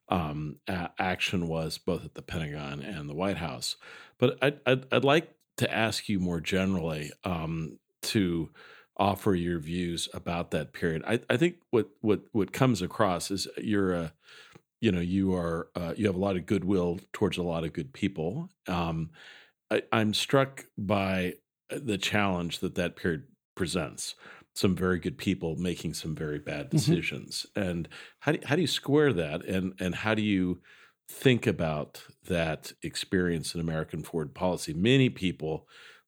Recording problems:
none

